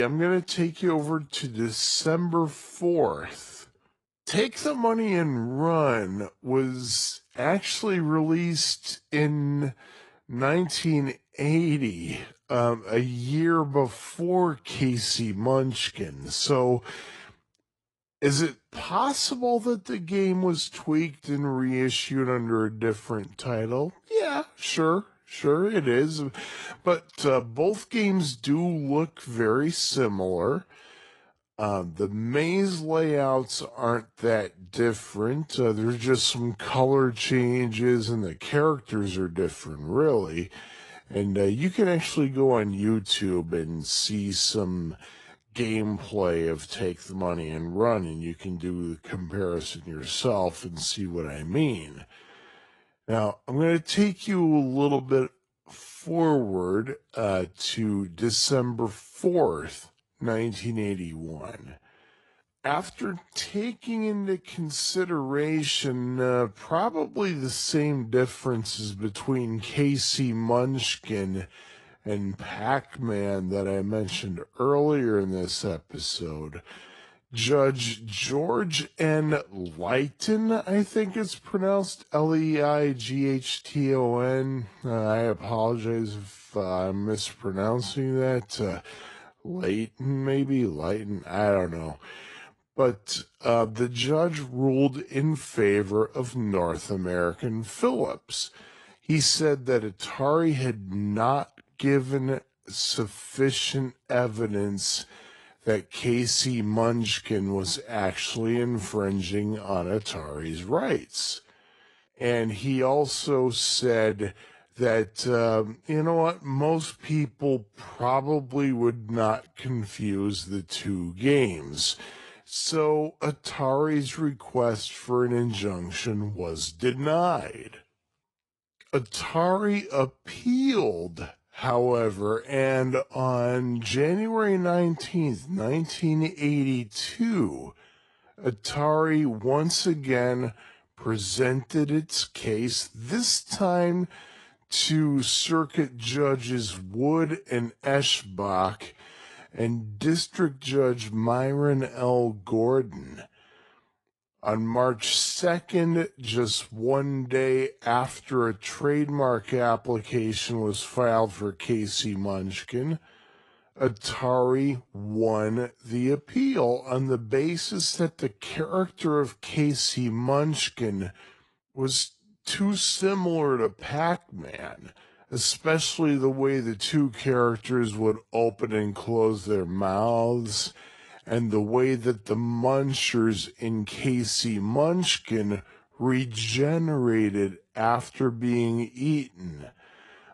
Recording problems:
wrong speed, natural pitch; too slow; 0.6 times normal speed
garbled, watery; slightly; nothing above 10.5 kHz
abrupt cut into speech; at the start

